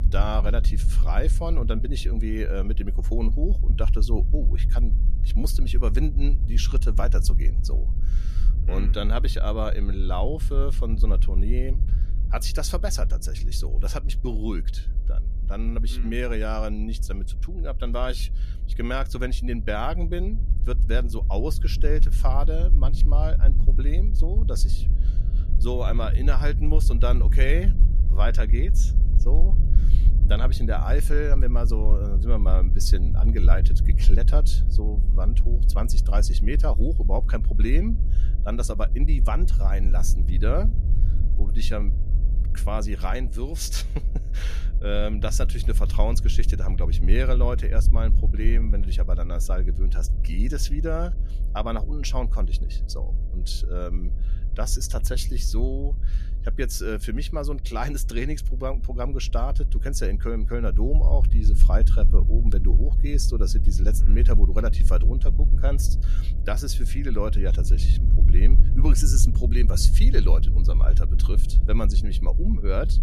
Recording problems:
low rumble; noticeable; throughout; 10 dB below the speech
electrical hum; faint; throughout; 60 Hz, 25 dB below the speech

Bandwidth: 14.5 kHz